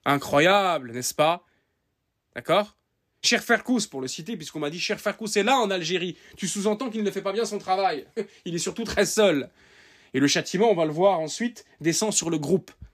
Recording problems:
none

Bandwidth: 14.5 kHz